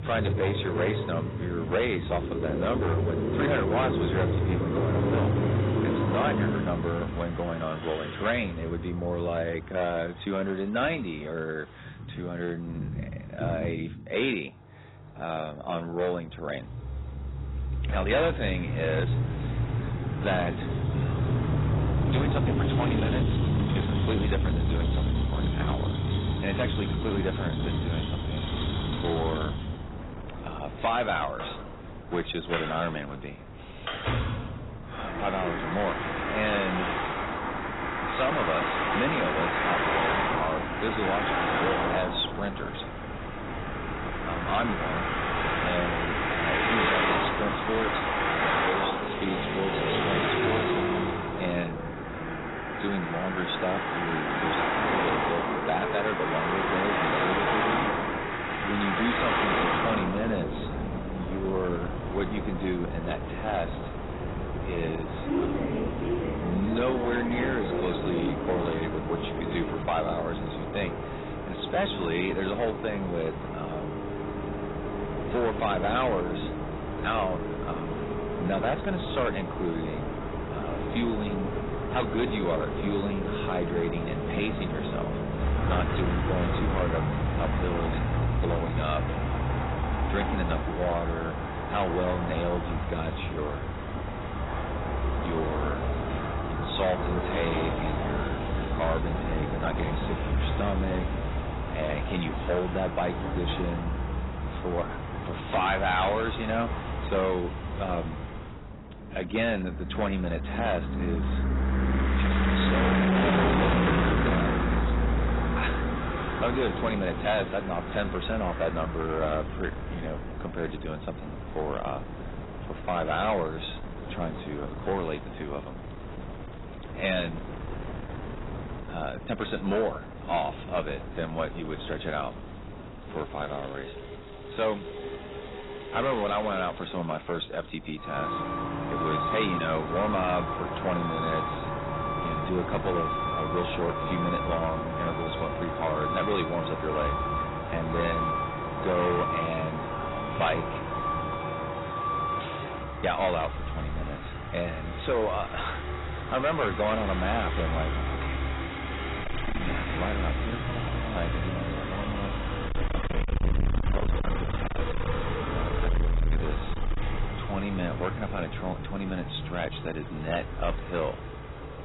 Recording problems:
distortion; heavy; 8% of the sound clipped
garbled, watery; badly; nothing above 4 kHz
traffic noise; very loud; throughout; 1 dB above the speech
wind noise on the microphone; occasional gusts; from 19 s to 2:31; 15 dB below the speech

